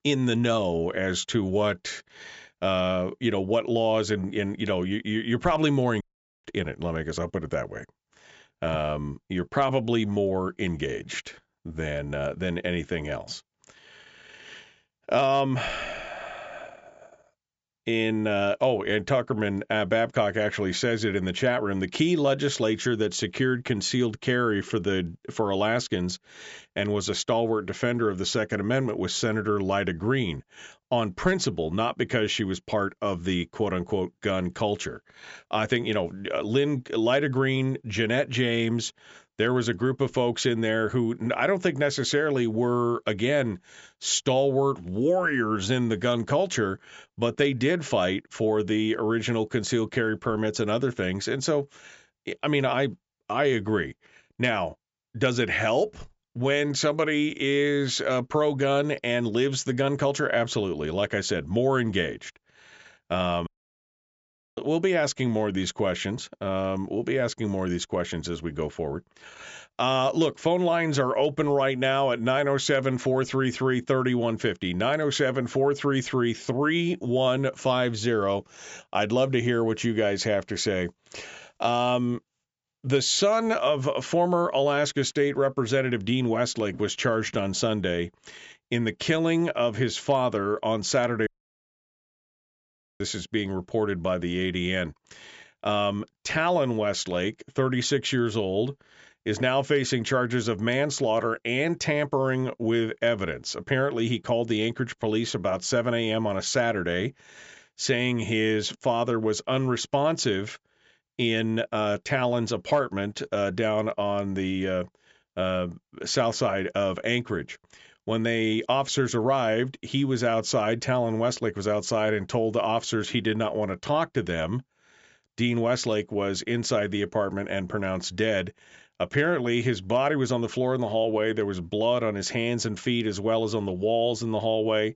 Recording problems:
high frequencies cut off; noticeable; nothing above 8 kHz
audio cutting out; at 6 s, at 1:03 for 1 s and at 1:31 for 1.5 s

